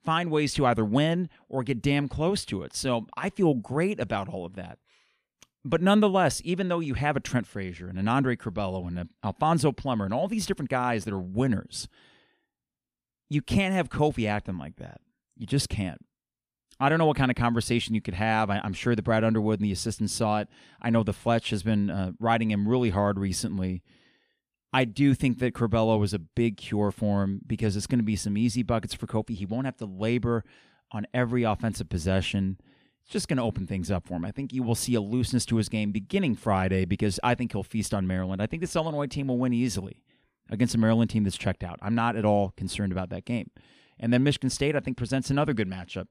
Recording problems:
none

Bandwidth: 15 kHz